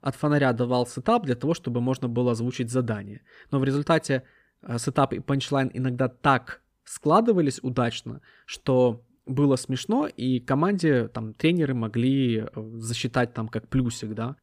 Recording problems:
none

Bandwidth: 15 kHz